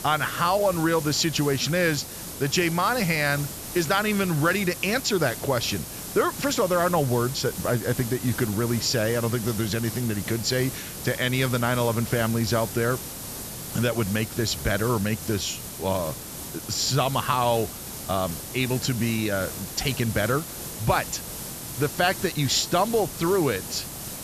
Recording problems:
high frequencies cut off; noticeable; nothing above 8 kHz
hiss; loud; throughout; 9 dB below the speech

